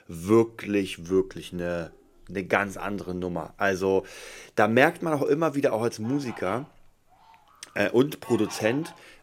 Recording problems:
animal sounds; faint; throughout; 20 dB below the speech

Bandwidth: 16 kHz